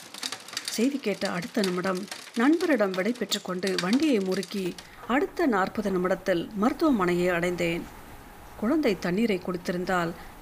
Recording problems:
rain or running water; noticeable; throughout; 15 dB below the speech

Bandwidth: 15 kHz